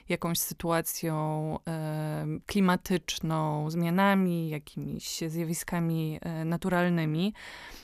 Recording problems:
none

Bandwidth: 14.5 kHz